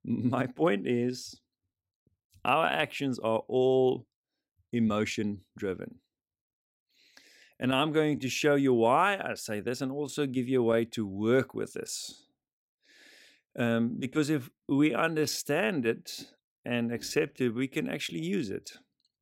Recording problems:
uneven, jittery; strongly; from 1 to 18 s

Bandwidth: 16 kHz